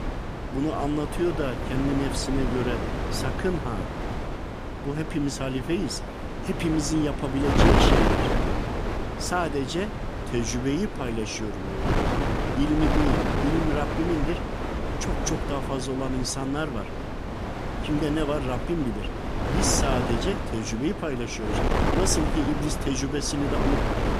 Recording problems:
wind noise on the microphone; heavy; as loud as the speech

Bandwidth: 14.5 kHz